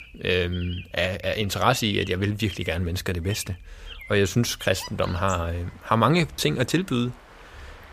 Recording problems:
animal sounds; noticeable; throughout; 20 dB below the speech

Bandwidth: 15 kHz